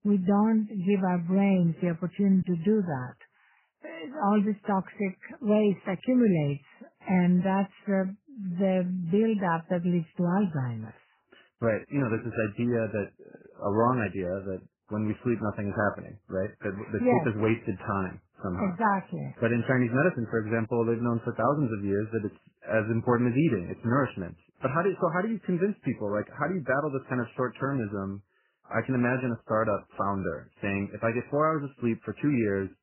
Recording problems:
garbled, watery; badly; nothing above 3 kHz

